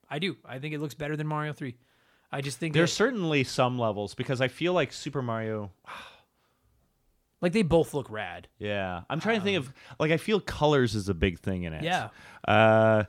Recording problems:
none

